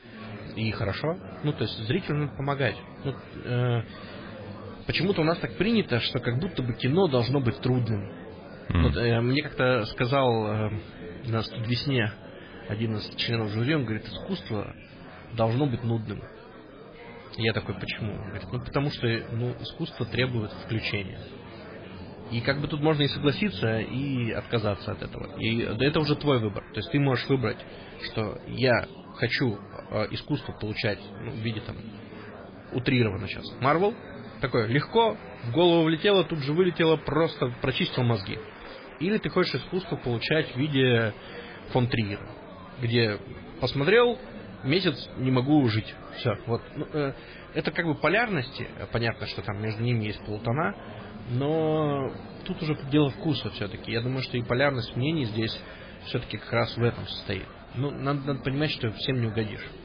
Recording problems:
garbled, watery; badly; nothing above 4 kHz
murmuring crowd; noticeable; throughout; 15 dB below the speech

